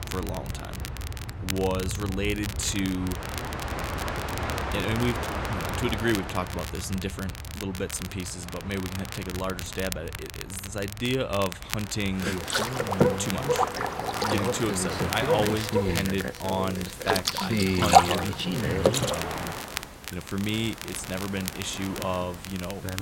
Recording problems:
train or aircraft noise; very loud; throughout; 3 dB above the speech
crackle, like an old record; loud; 7 dB below the speech

